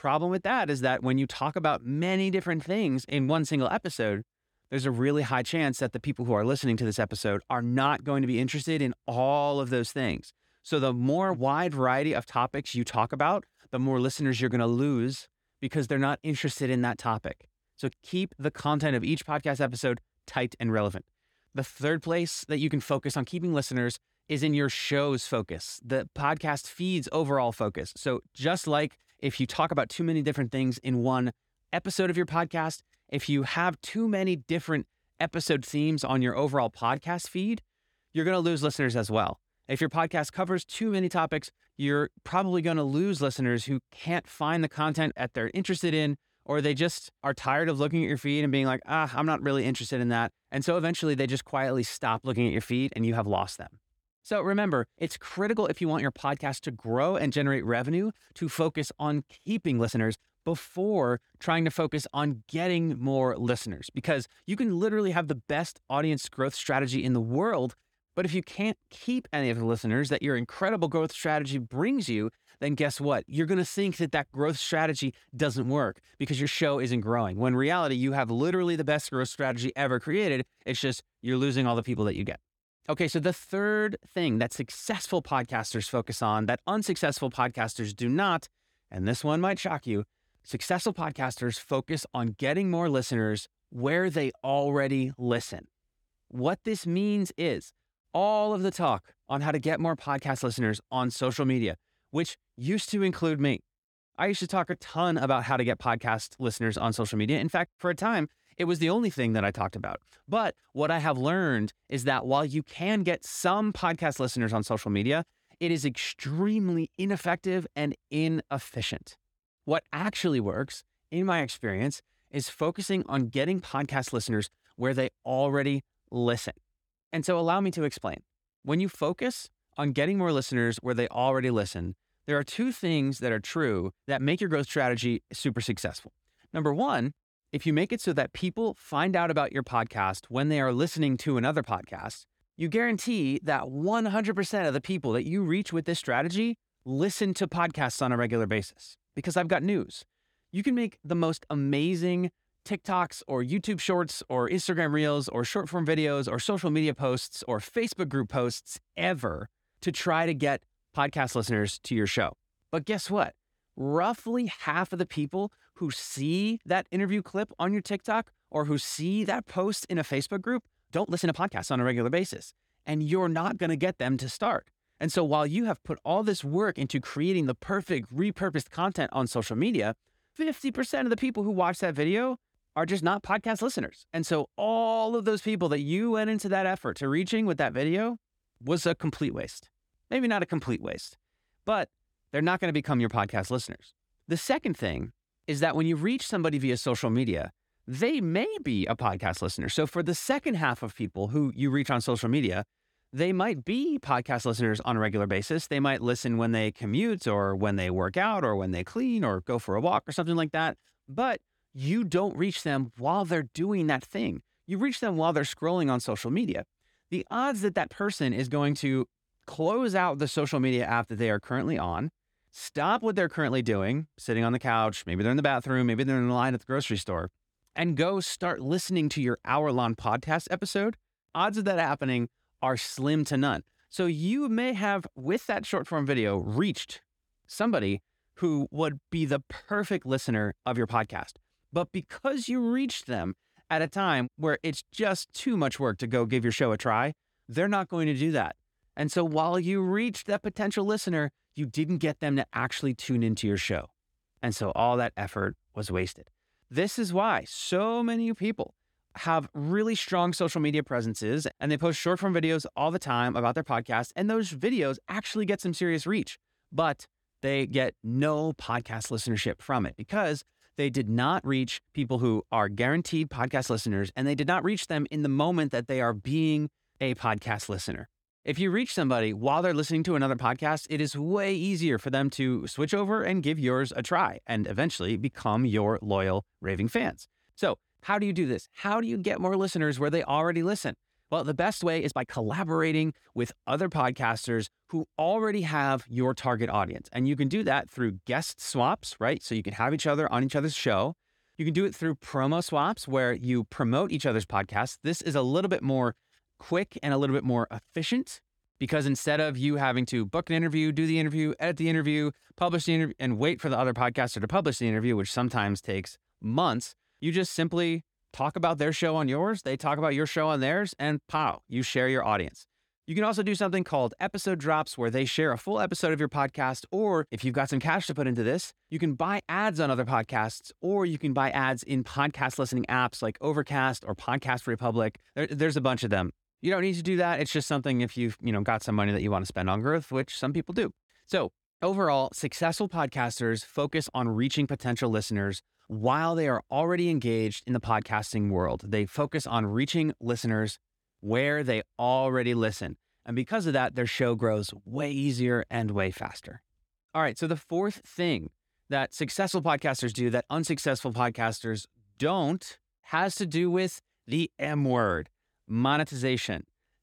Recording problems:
uneven, jittery; strongly; from 24 s to 5:13

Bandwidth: 18 kHz